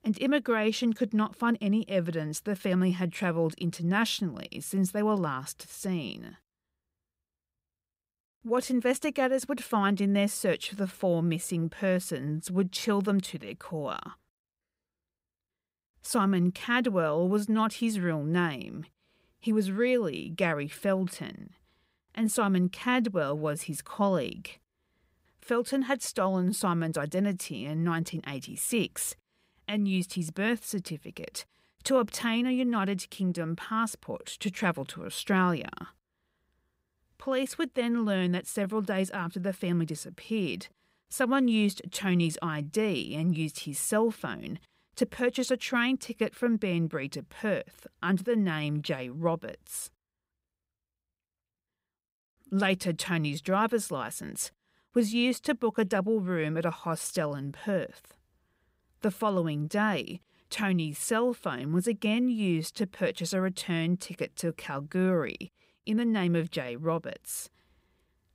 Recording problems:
none

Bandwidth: 15.5 kHz